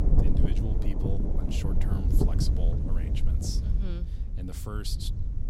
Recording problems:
wind noise on the microphone; heavy; 2 dB above the speech

